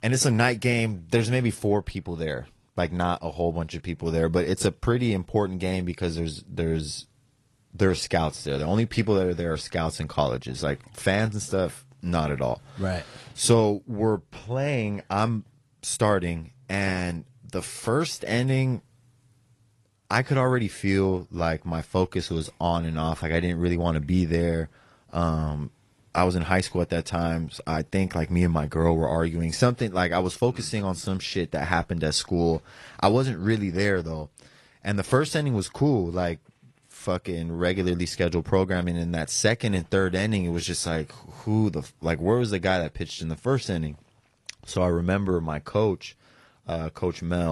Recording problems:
garbled, watery; slightly; nothing above 11 kHz
abrupt cut into speech; at the end

